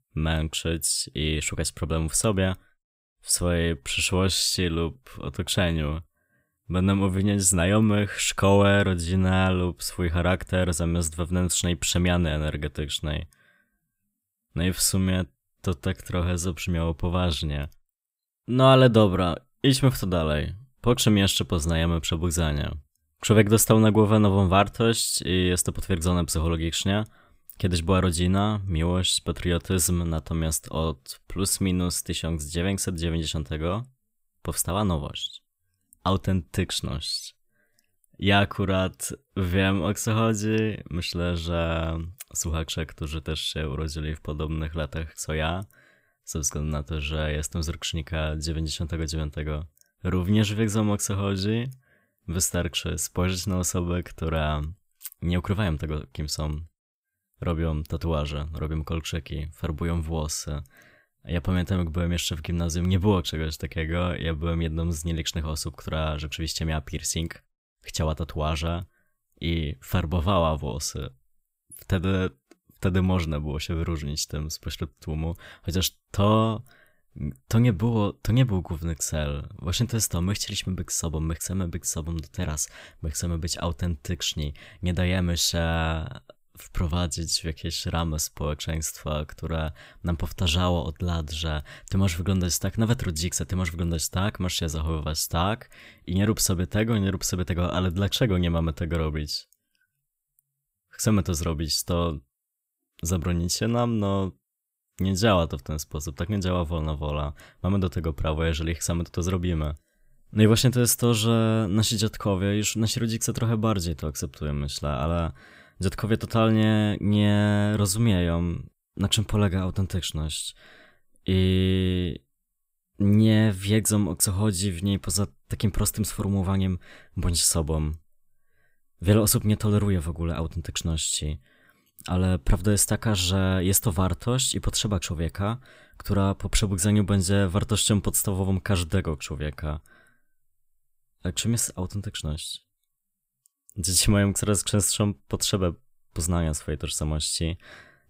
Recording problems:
none

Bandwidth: 15.5 kHz